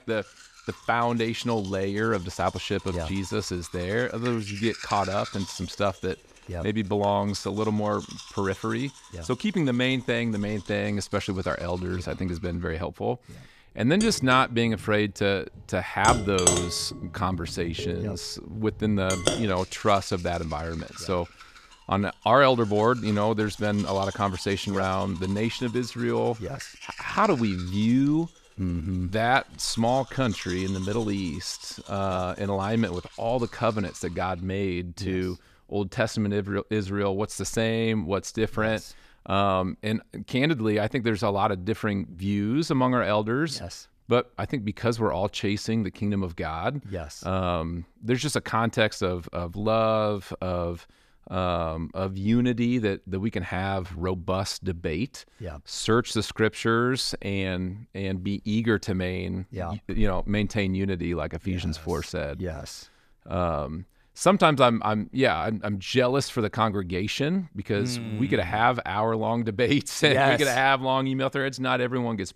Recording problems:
household noises; noticeable; until 34 s; 10 dB below the speech

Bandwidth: 14.5 kHz